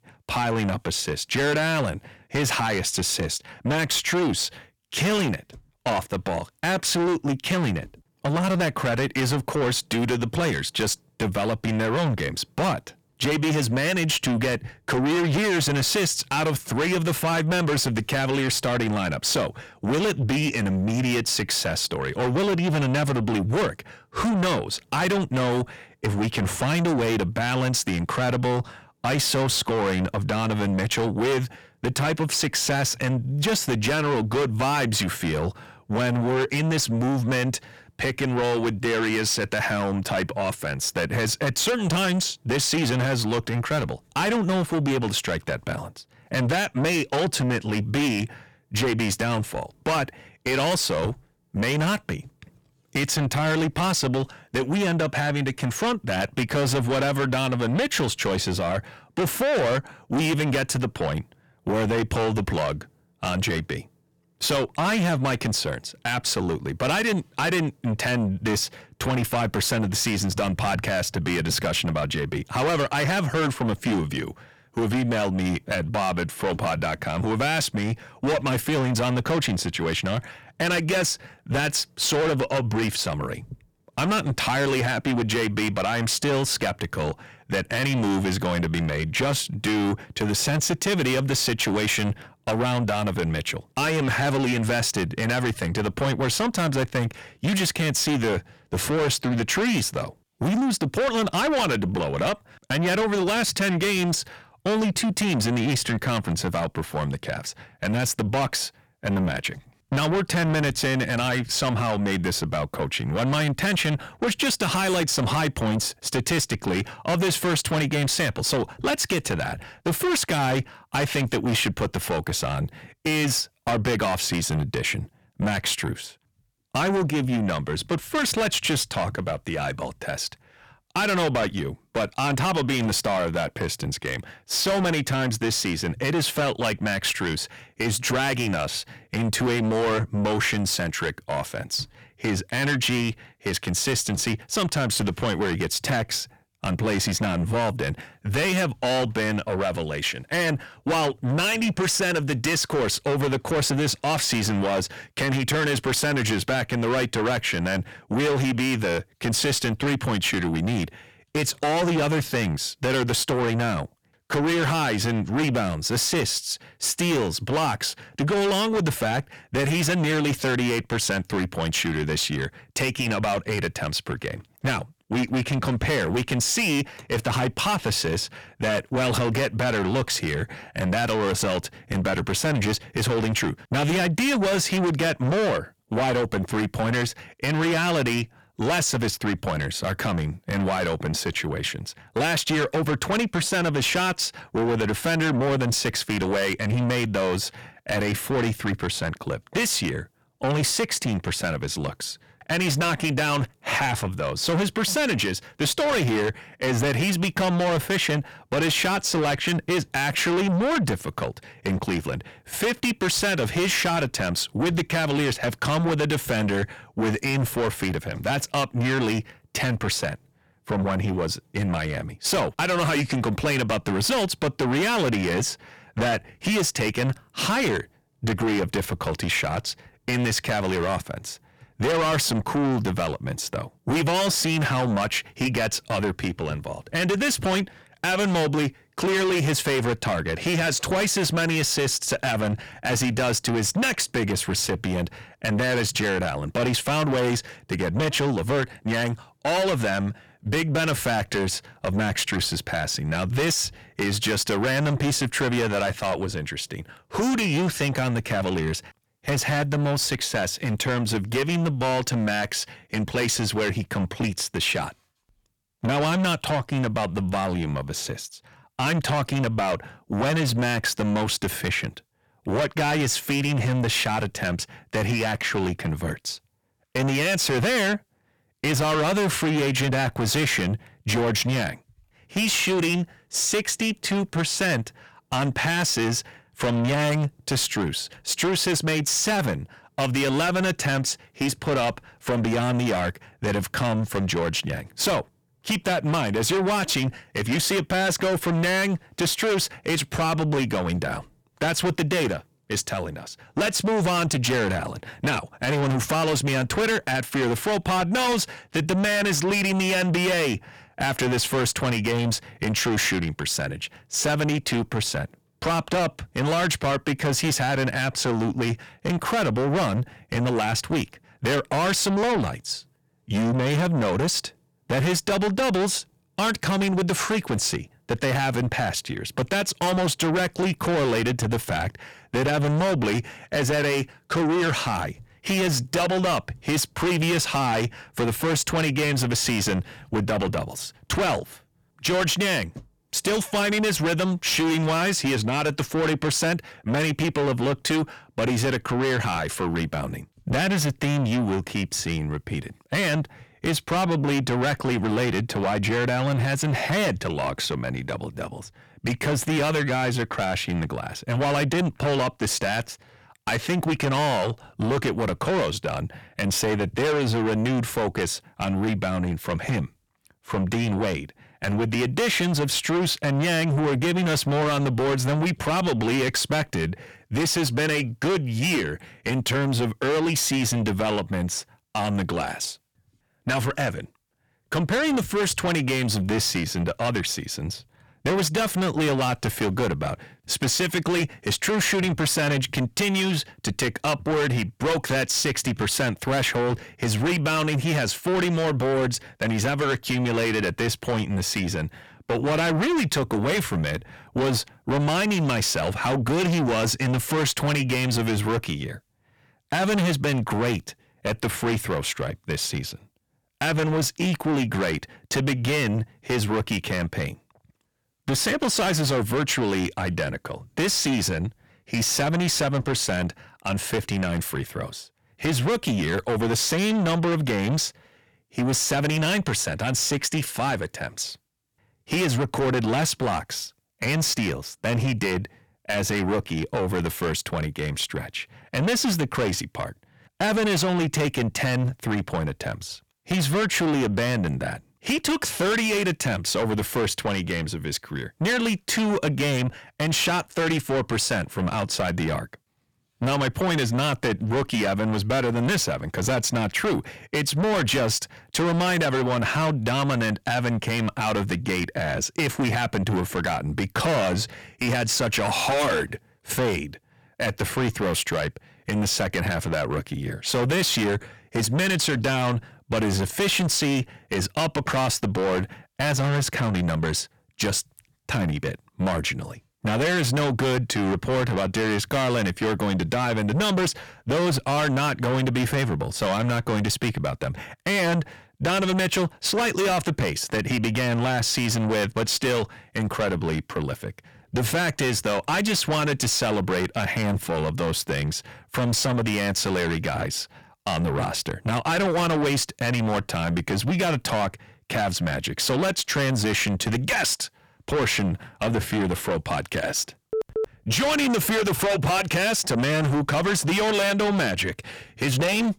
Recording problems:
distortion; heavy; 6 dB below the speech

